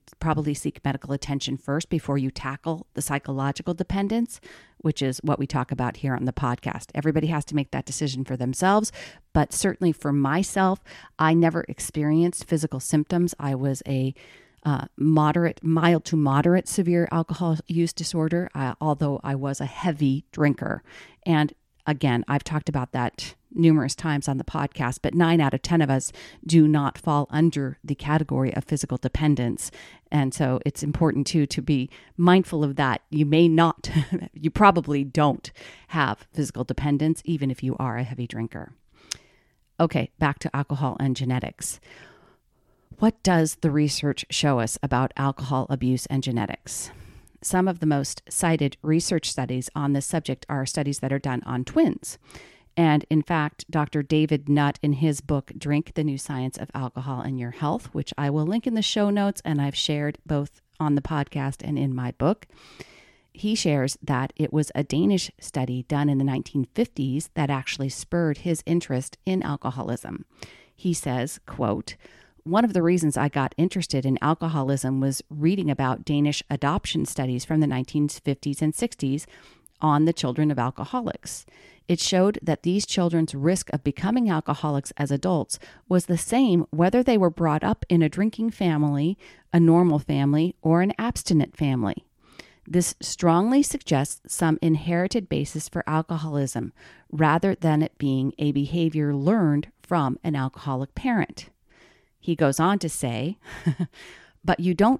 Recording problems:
none

